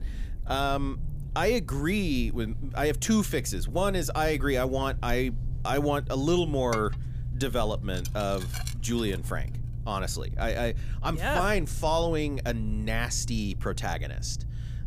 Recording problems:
low rumble; faint; throughout; 20 dB below the speech
clattering dishes; noticeable; from 6.5 to 9 s; peak 9 dB below the speech

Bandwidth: 15 kHz